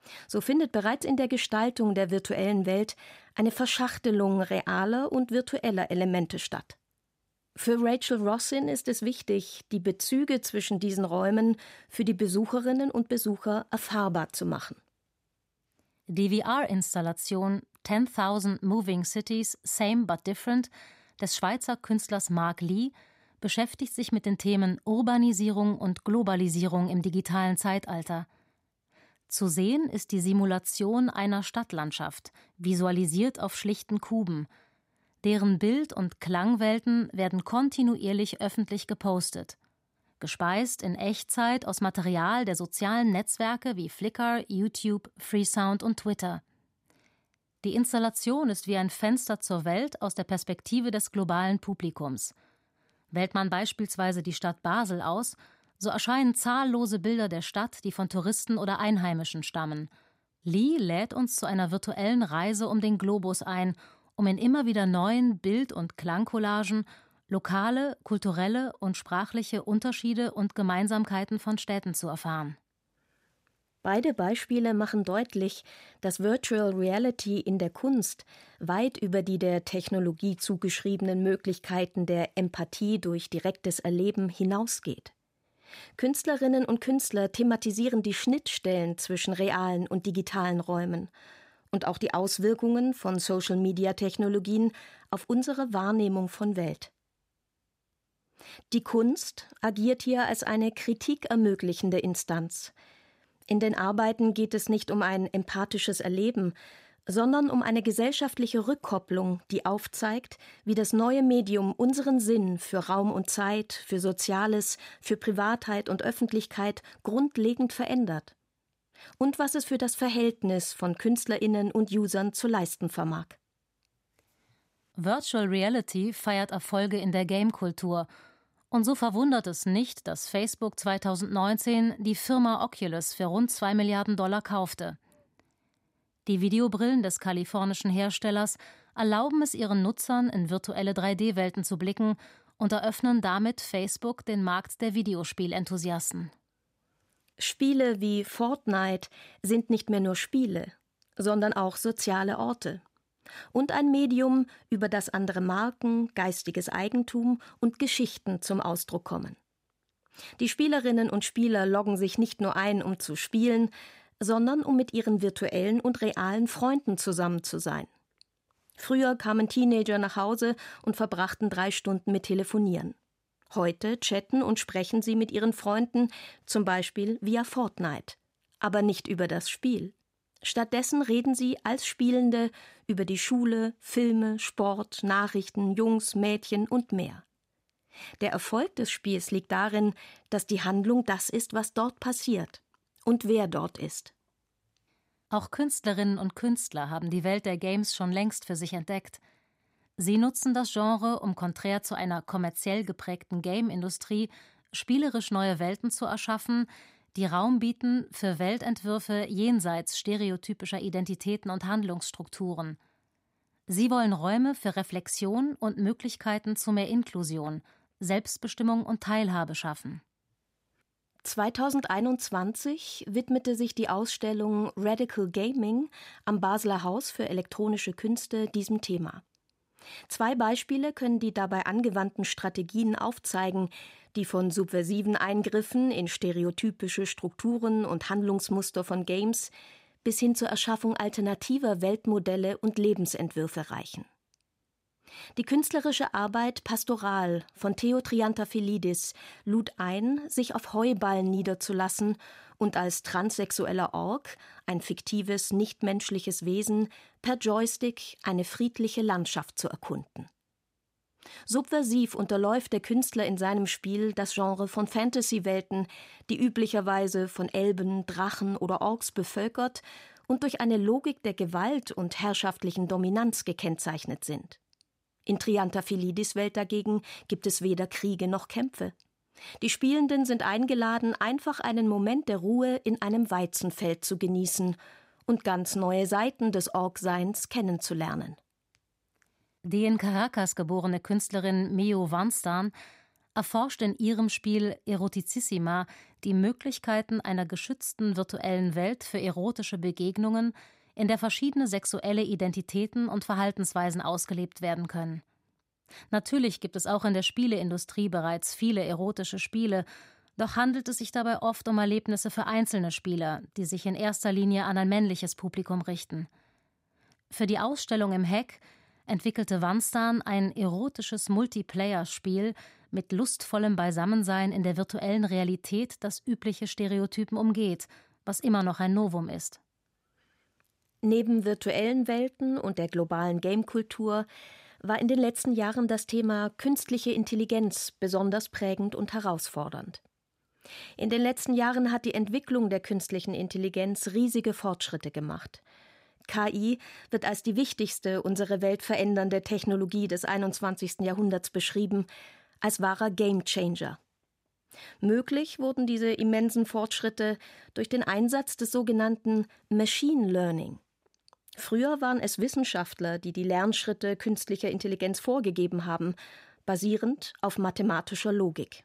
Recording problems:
none

